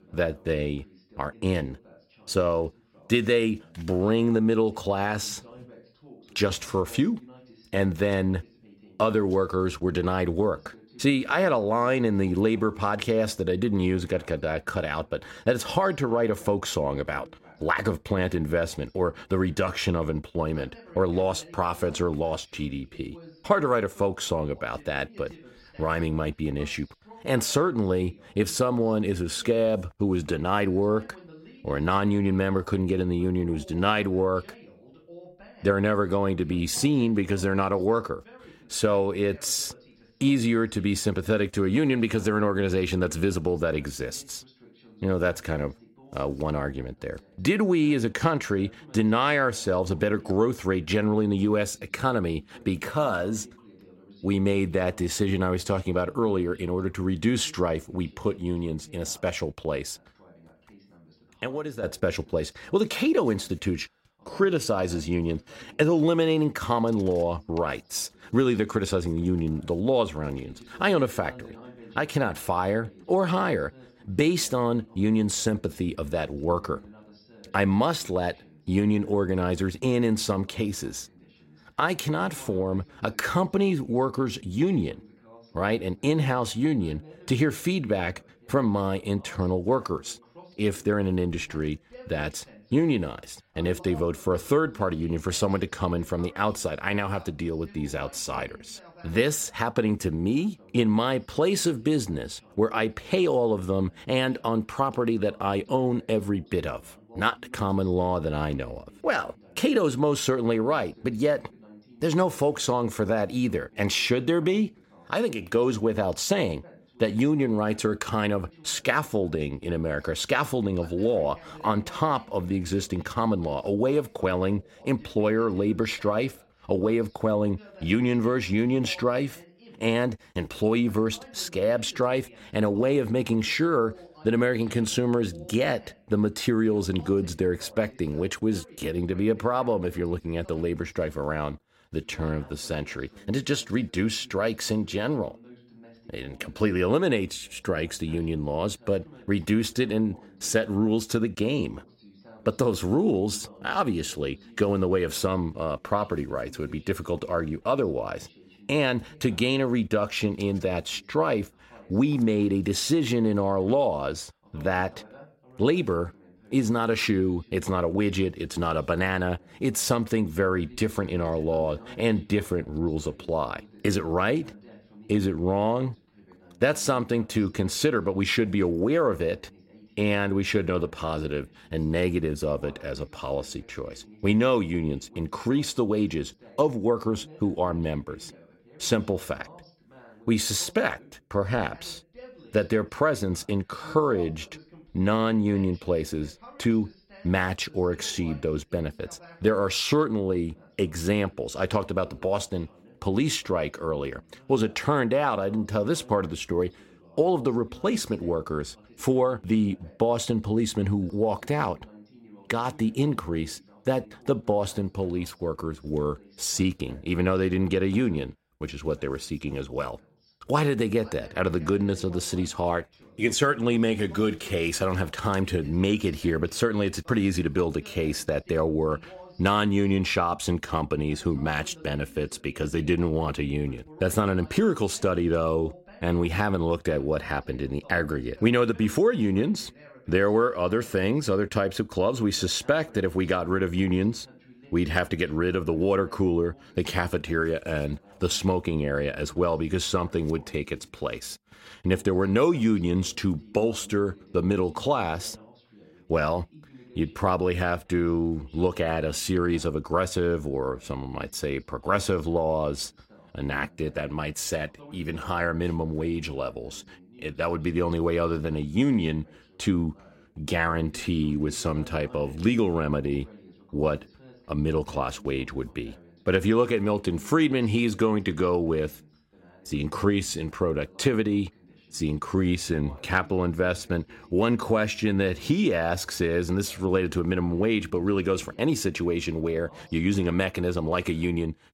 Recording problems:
voice in the background; faint; throughout; 25 dB below the speech

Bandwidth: 16 kHz